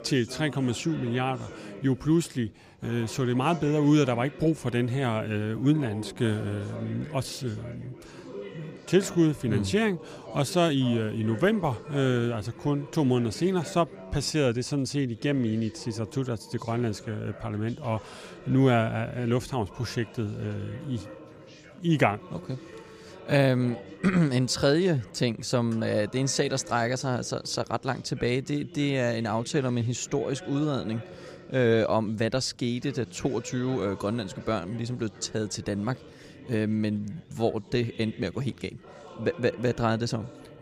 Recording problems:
background chatter; noticeable; throughout; 3 voices, 15 dB below the speech

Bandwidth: 15 kHz